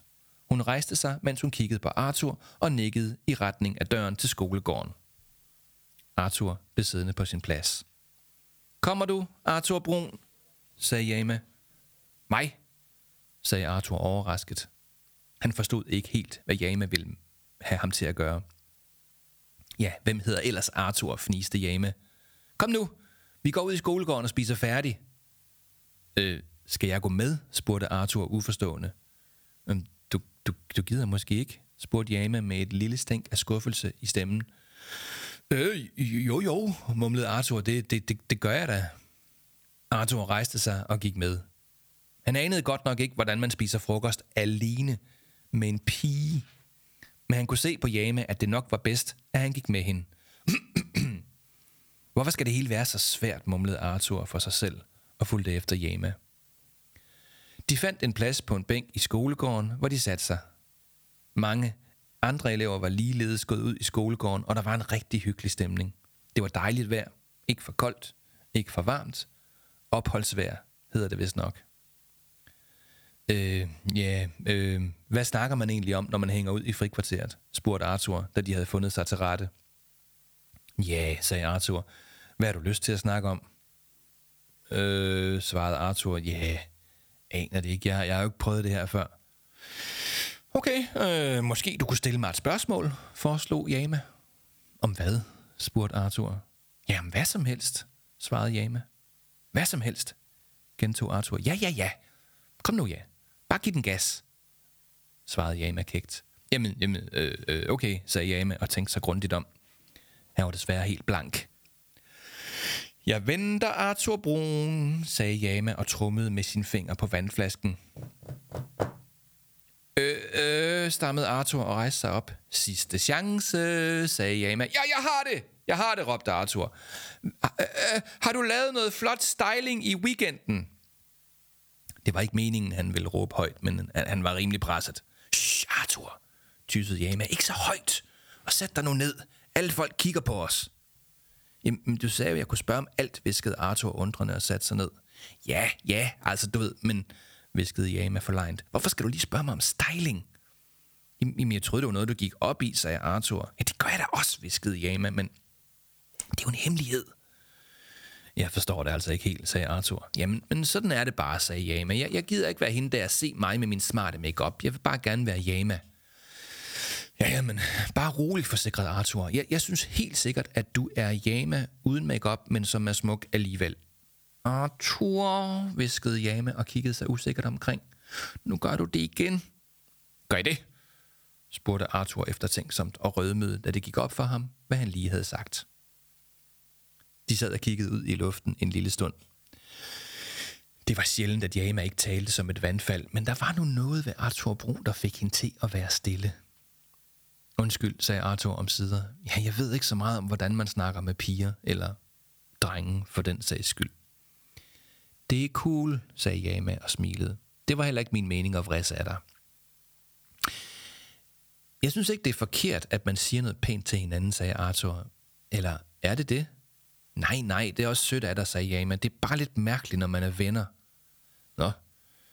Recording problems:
squashed, flat; somewhat

